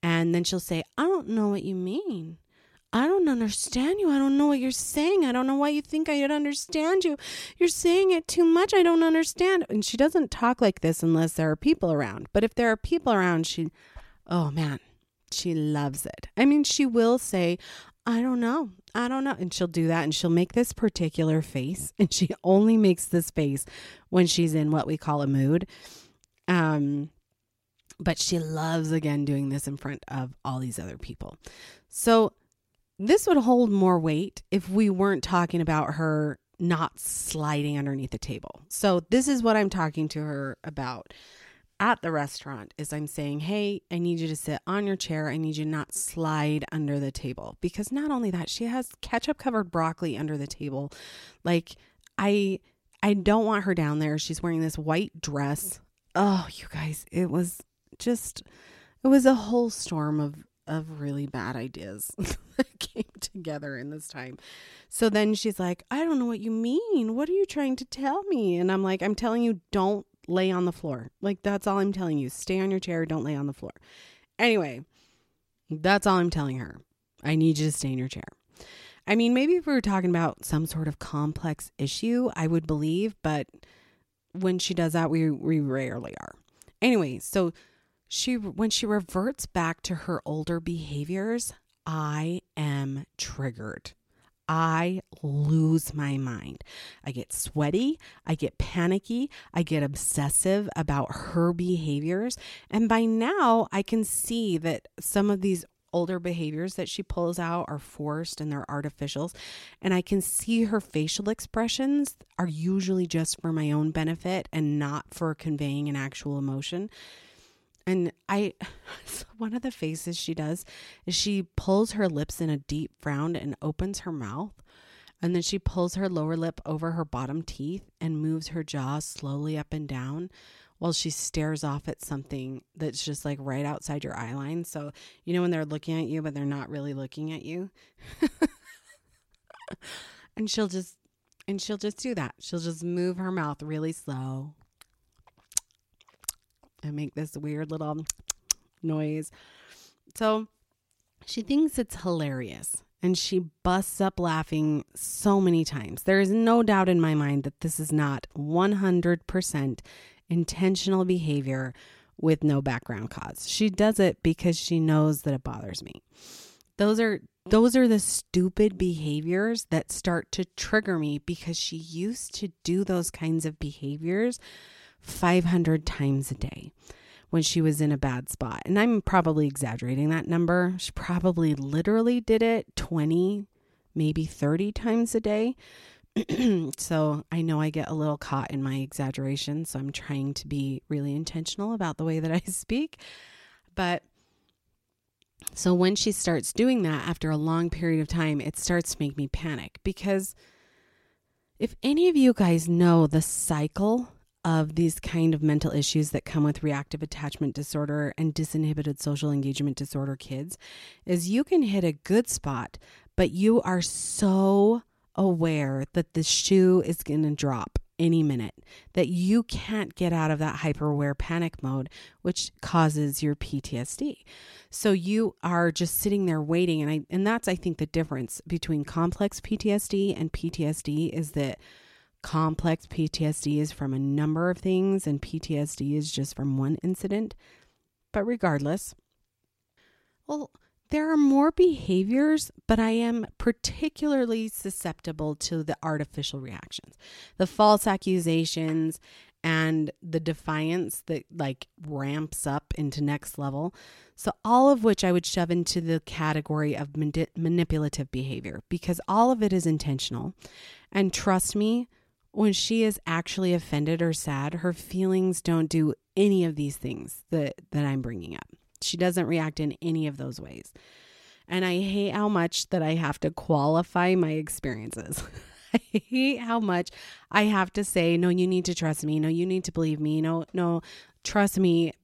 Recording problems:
none

